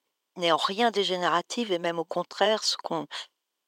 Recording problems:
thin; very; fading below 350 Hz

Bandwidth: 16 kHz